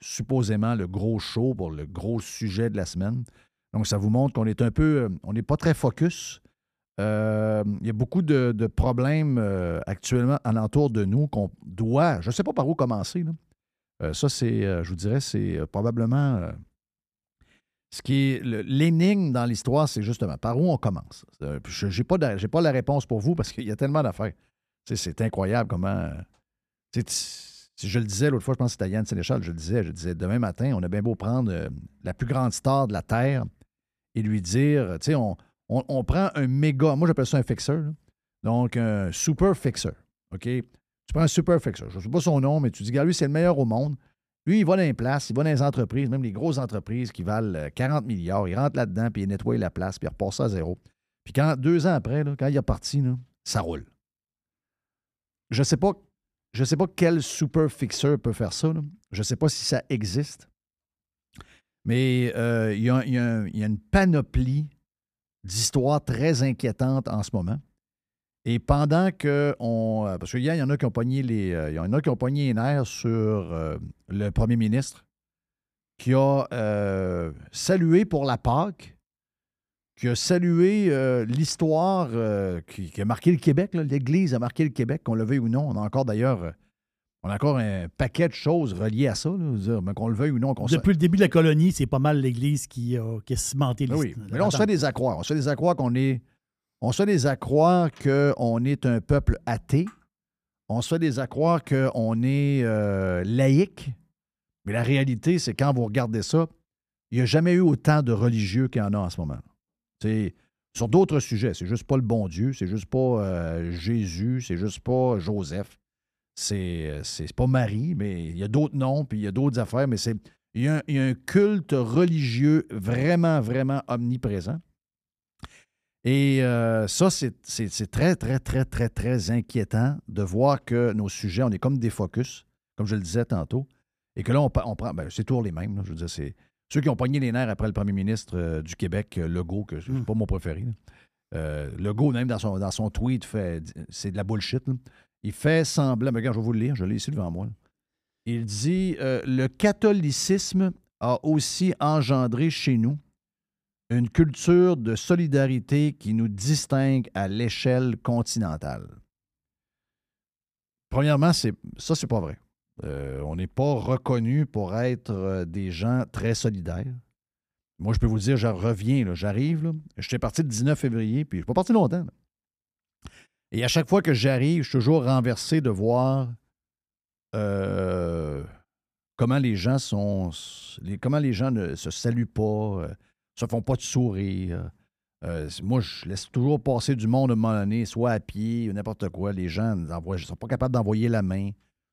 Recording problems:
none

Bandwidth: 14.5 kHz